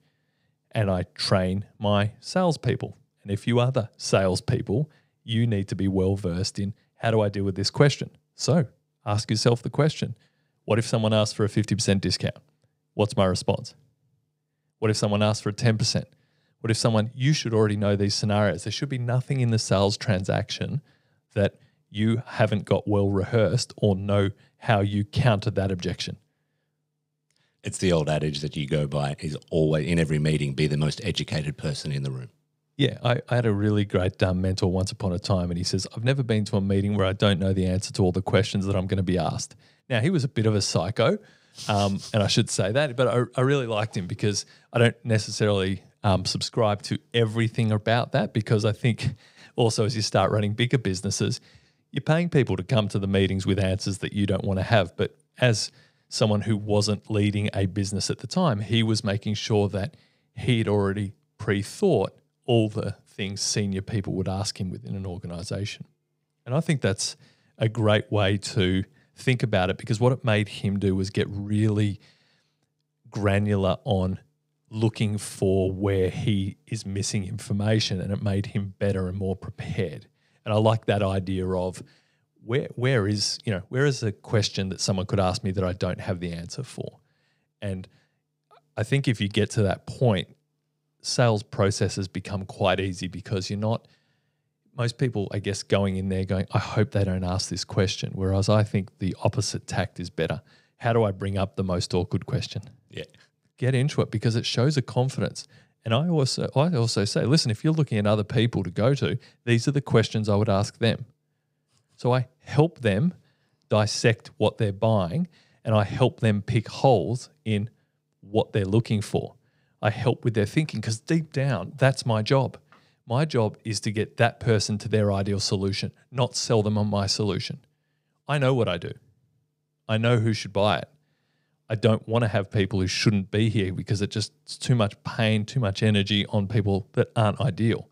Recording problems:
none

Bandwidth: 15.5 kHz